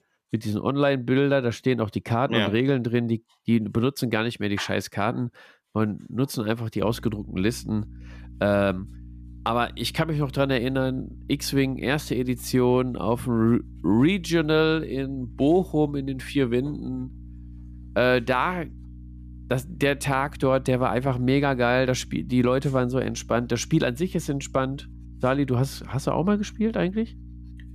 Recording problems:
electrical hum; faint; from 7 s on; 60 Hz, 30 dB below the speech

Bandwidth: 14.5 kHz